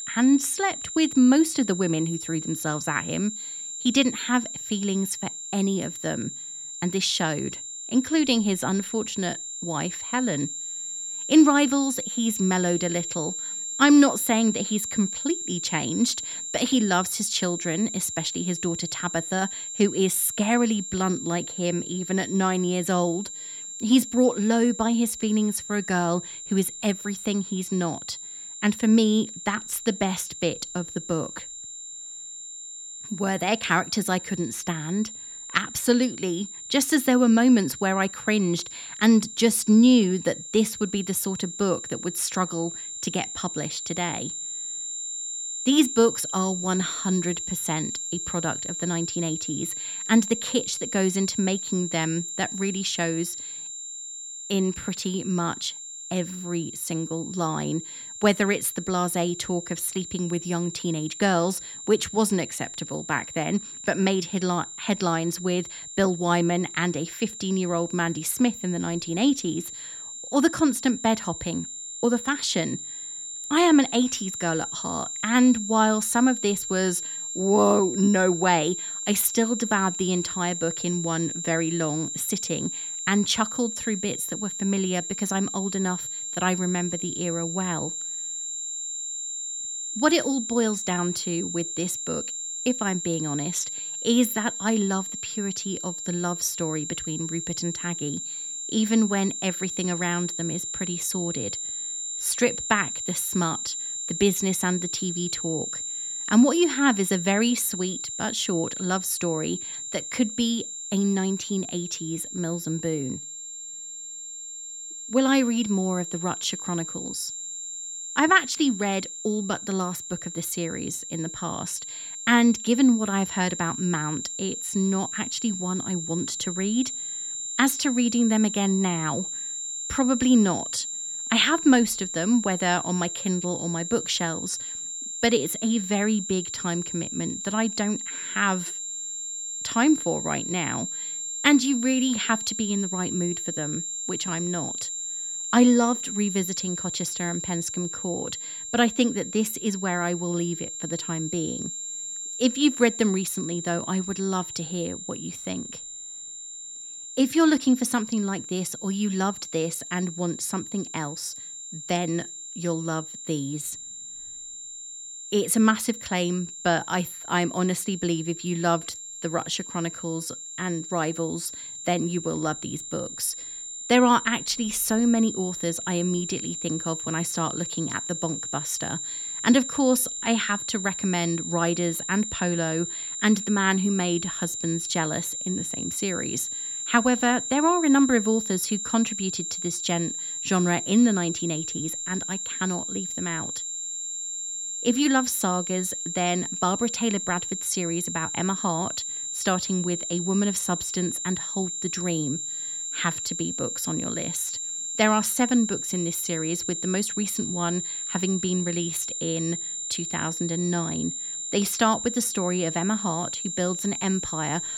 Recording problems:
high-pitched whine; loud; throughout; 7.5 kHz, 6 dB below the speech

